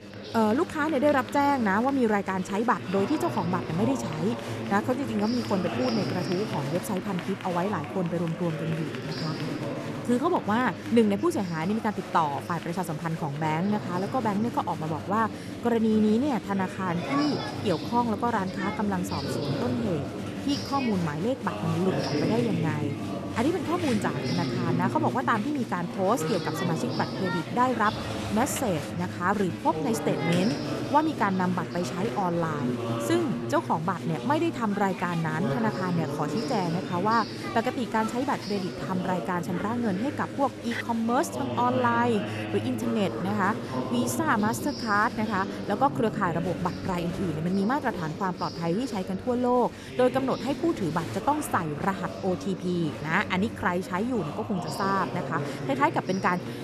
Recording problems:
chatter from many people; loud; throughout; 6 dB below the speech

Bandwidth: 13.5 kHz